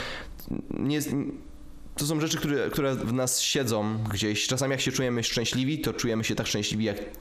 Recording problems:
squashed, flat; heavily

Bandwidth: 14.5 kHz